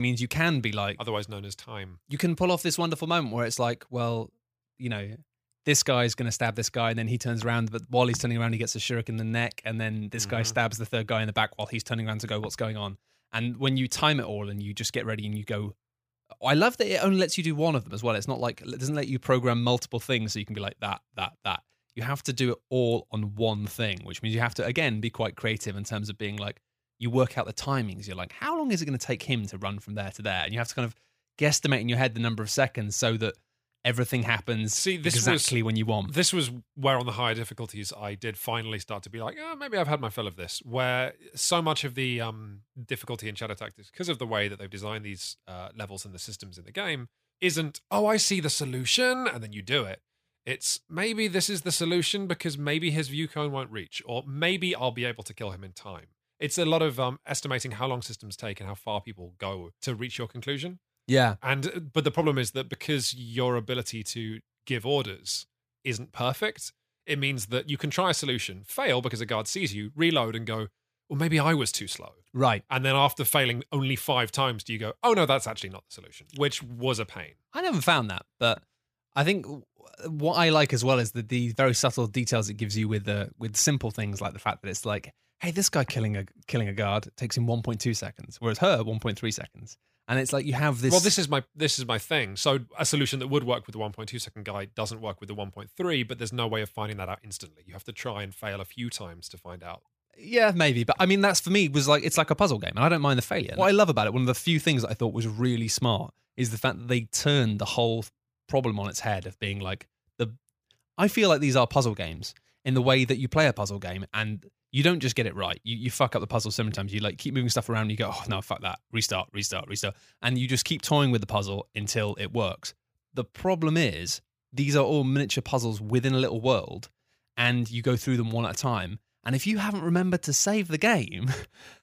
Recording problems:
abrupt cut into speech; at the start

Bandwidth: 15 kHz